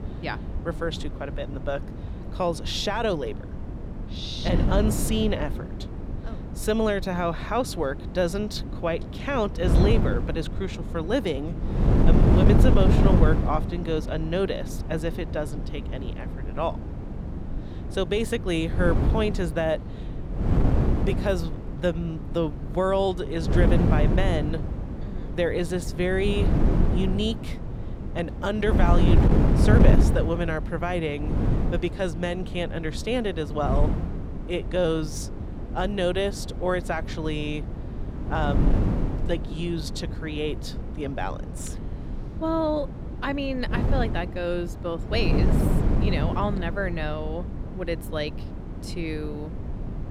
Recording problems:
wind noise on the microphone; heavy; 7 dB below the speech

